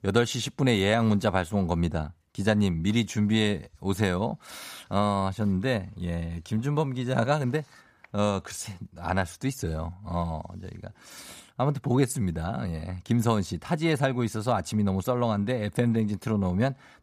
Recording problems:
none

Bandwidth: 15 kHz